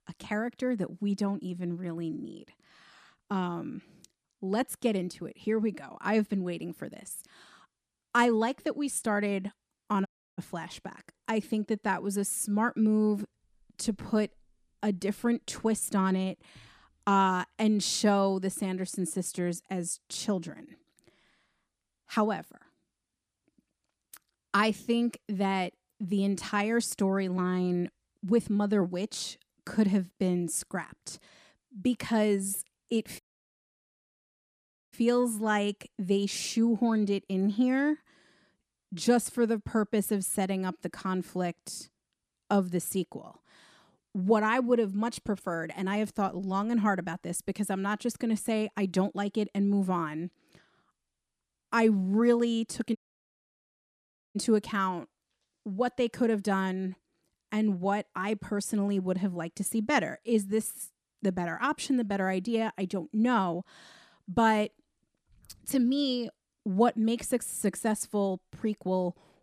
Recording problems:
audio cutting out; at 10 s, at 33 s for 1.5 s and at 53 s for 1.5 s

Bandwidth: 14.5 kHz